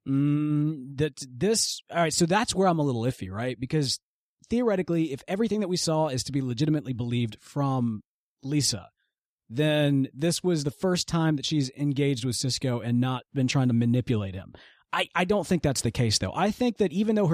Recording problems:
abrupt cut into speech; at the end

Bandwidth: 14.5 kHz